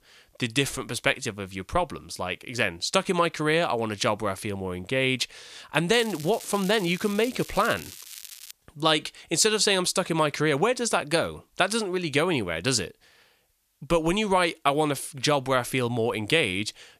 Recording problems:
crackling; noticeable; from 6 to 8.5 s; 15 dB below the speech

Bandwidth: 14.5 kHz